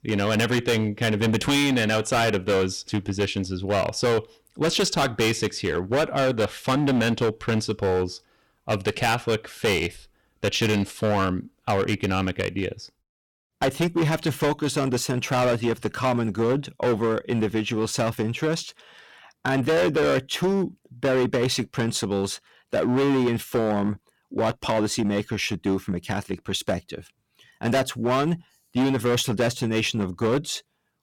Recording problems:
distortion; heavy; 14% of the sound clipped

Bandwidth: 17 kHz